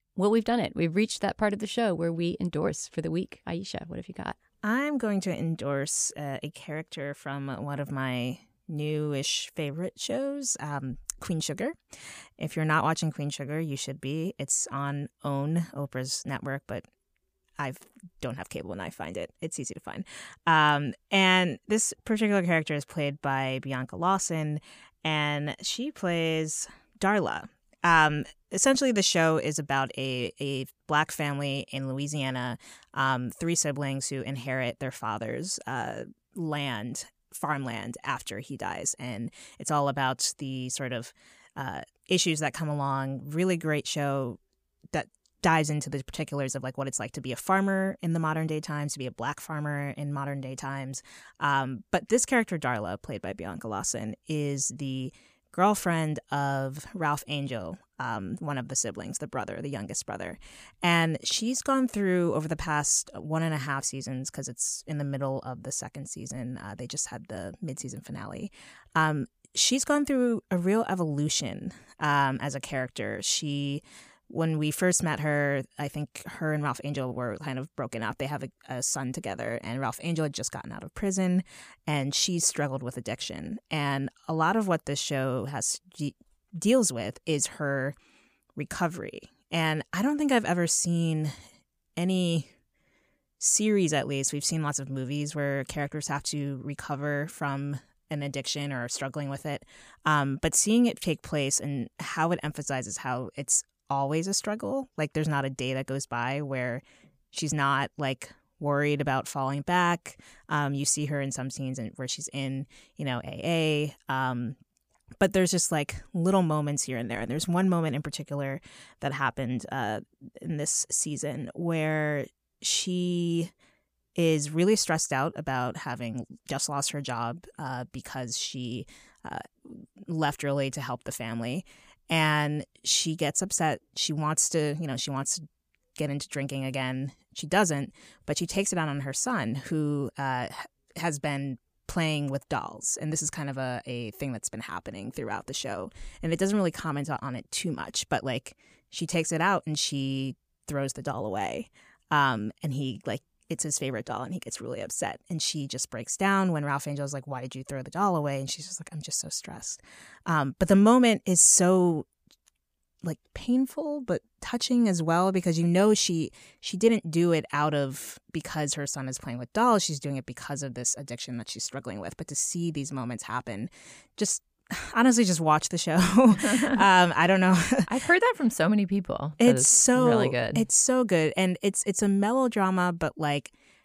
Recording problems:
none

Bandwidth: 15 kHz